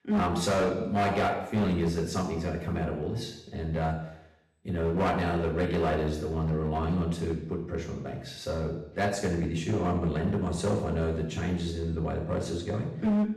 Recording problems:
off-mic speech; far
room echo; noticeable; dies away in 0.8 s
distortion; slight; 9% of the sound clipped

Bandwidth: 13.5 kHz